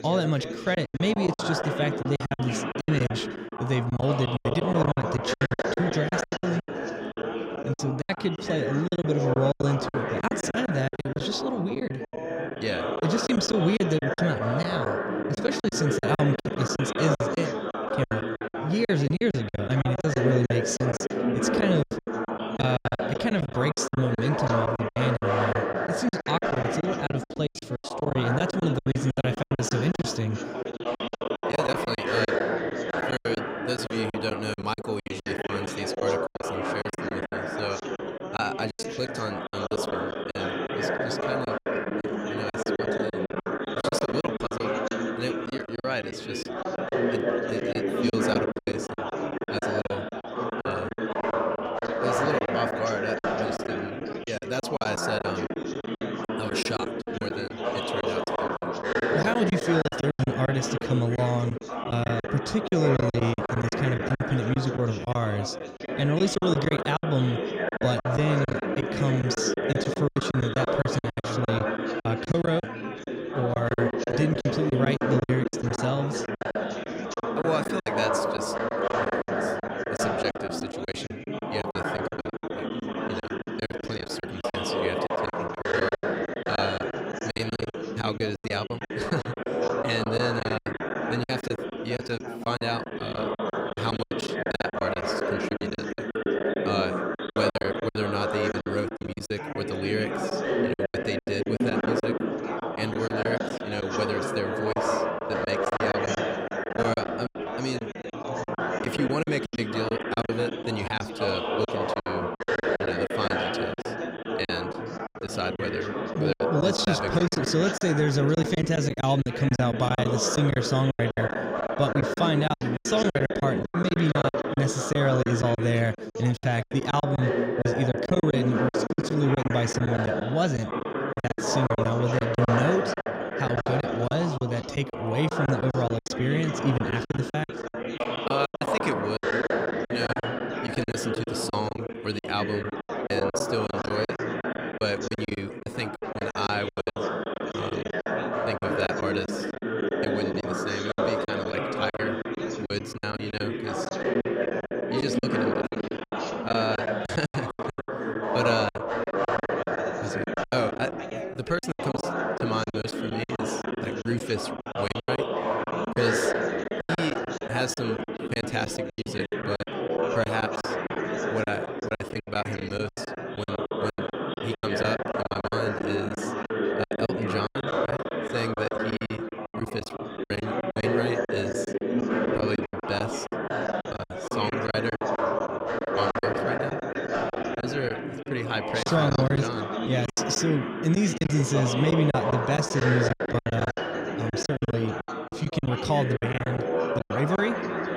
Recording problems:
chatter from many people; loud; throughout; 1 dB below the speech
choppy; very; 16% of the speech affected

